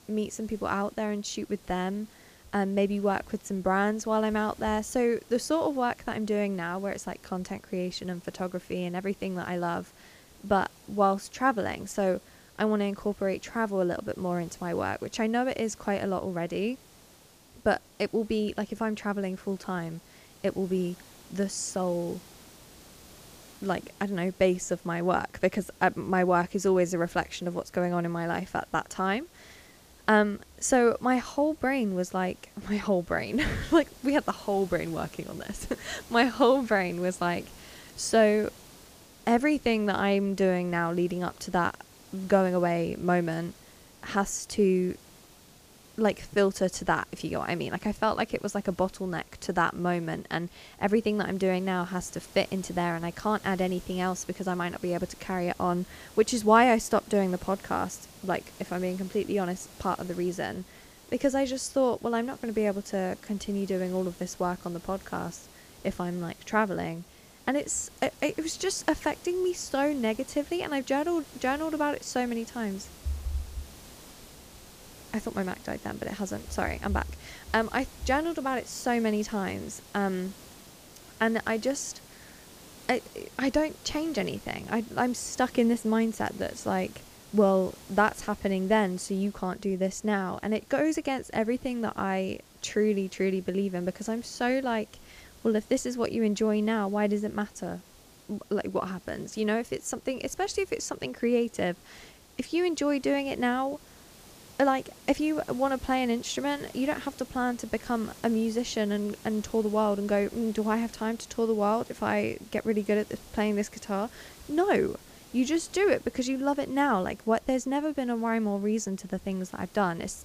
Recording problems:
hiss; faint; throughout; 20 dB below the speech

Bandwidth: 15 kHz